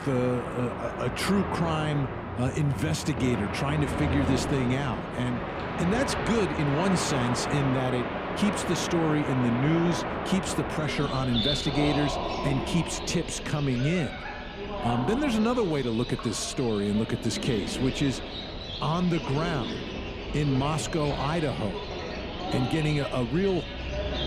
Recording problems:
animal sounds; loud; throughout; 4 dB below the speech

